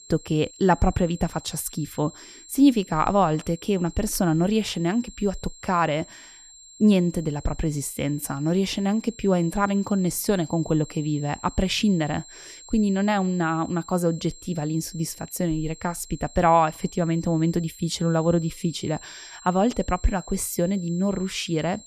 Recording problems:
high-pitched whine; noticeable; throughout; 7.5 kHz, 20 dB below the speech

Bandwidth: 14 kHz